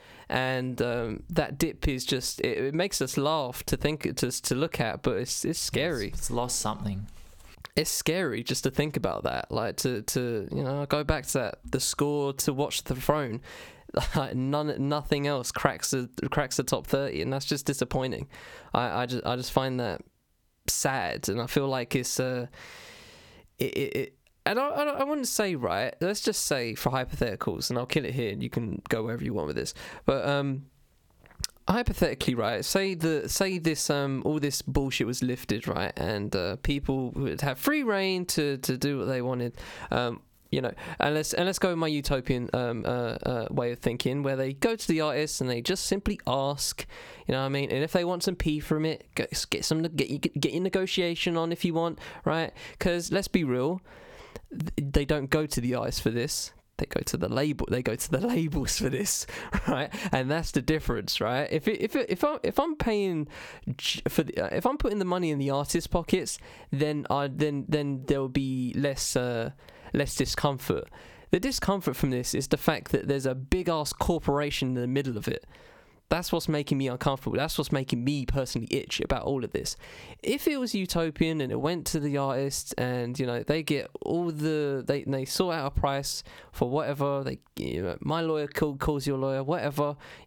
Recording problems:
squashed, flat; heavily

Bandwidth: 18.5 kHz